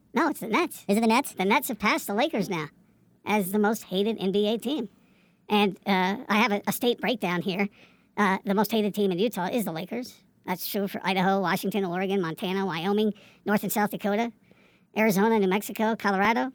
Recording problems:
wrong speed and pitch; too fast and too high; 1.5 times normal speed

